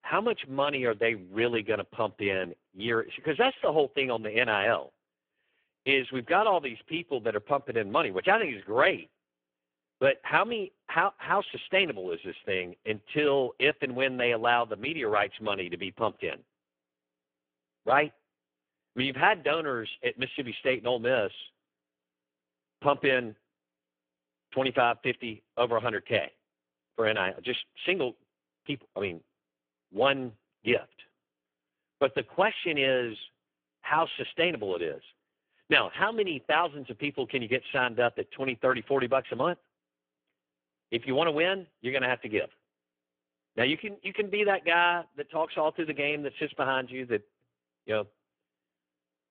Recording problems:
phone-call audio; poor line
muffled; very; fading above 3.5 kHz

